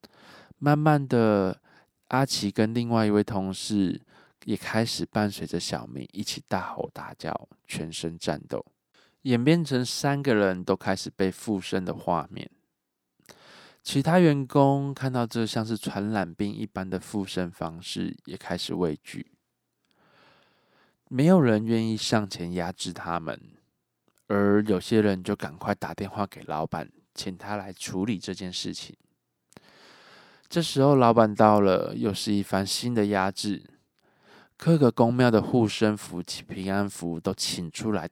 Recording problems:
none

